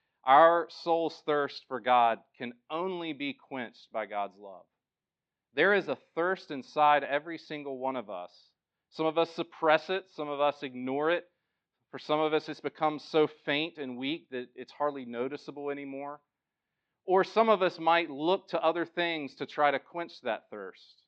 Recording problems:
muffled; slightly; fading above 4 kHz

